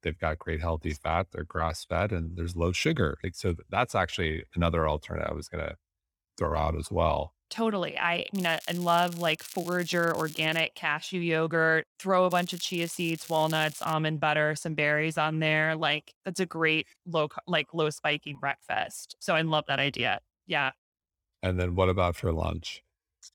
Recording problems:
crackling; noticeable; from 8.5 to 11 s and from 12 to 14 s; 15 dB below the speech

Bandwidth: 17 kHz